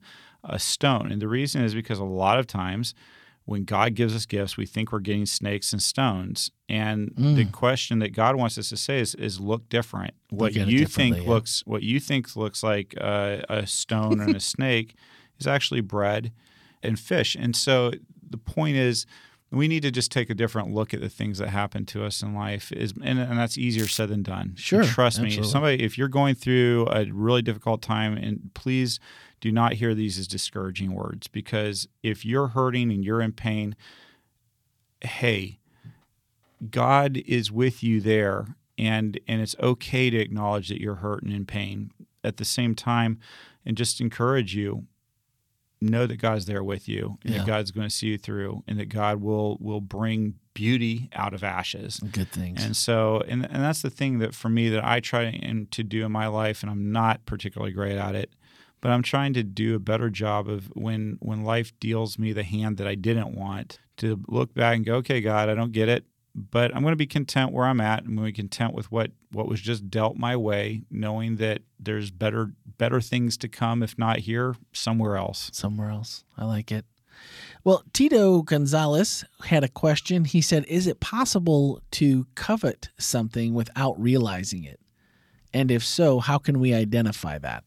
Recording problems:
crackling; noticeable; at 24 s; 10 dB below the speech

